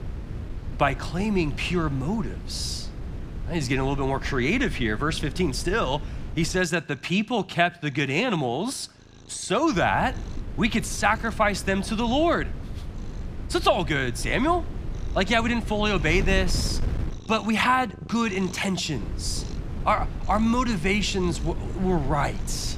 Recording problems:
wind noise on the microphone; occasional gusts; until 6.5 s, from 9.5 to 17 s and from 19 s on; 20 dB below the speech
animal sounds; faint; throughout; 20 dB below the speech

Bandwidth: 15.5 kHz